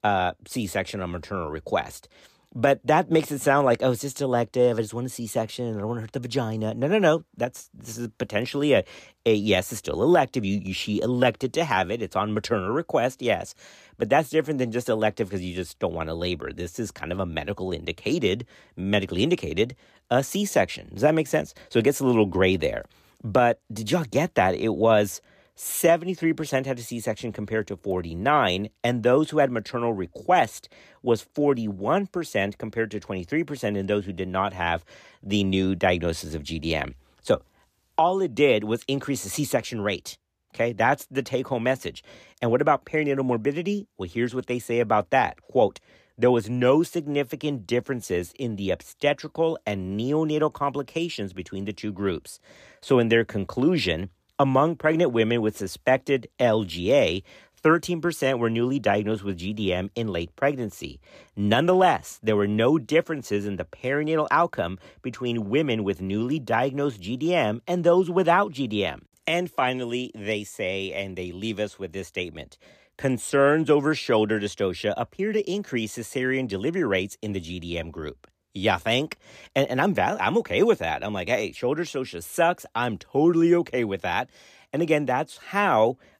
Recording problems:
none

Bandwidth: 14.5 kHz